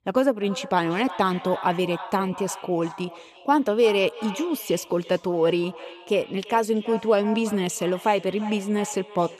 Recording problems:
echo of what is said; noticeable; throughout; 340 ms later, 15 dB below the speech

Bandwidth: 13.5 kHz